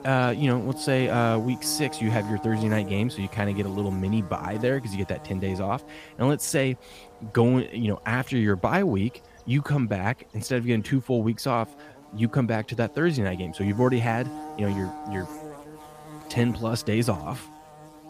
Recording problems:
electrical hum; noticeable; throughout; 60 Hz, 15 dB below the speech

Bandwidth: 15 kHz